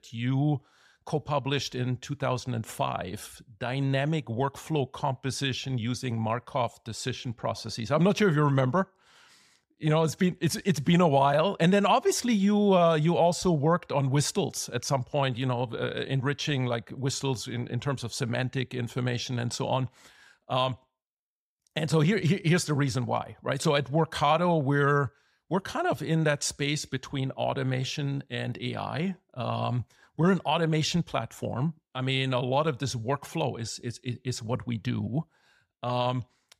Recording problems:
none

